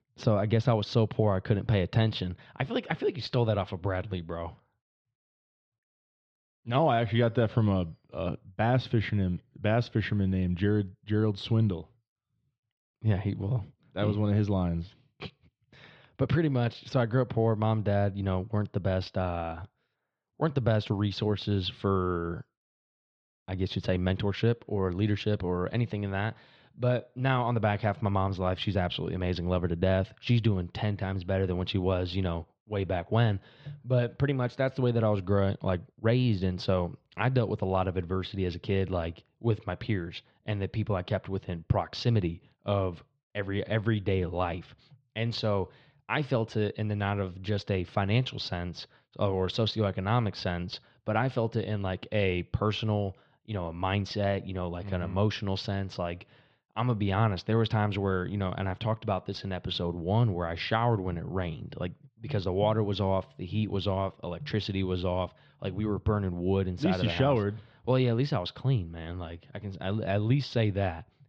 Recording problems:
muffled; slightly; fading above 3.5 kHz

